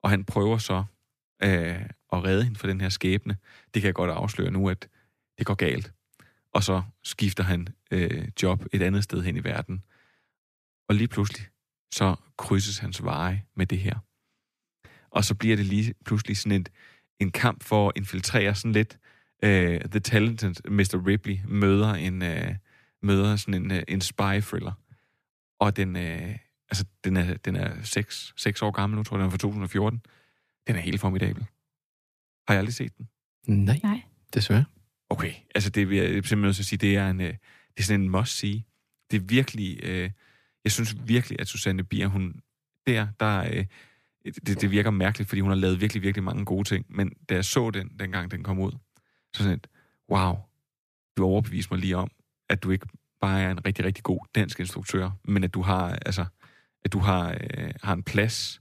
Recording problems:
none

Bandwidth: 14.5 kHz